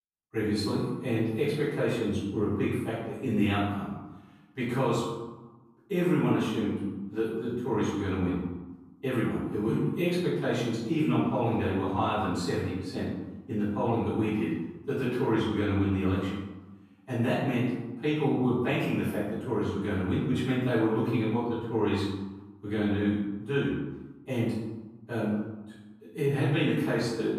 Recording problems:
room echo; strong; dies away in 1 s
off-mic speech; far

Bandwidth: 15 kHz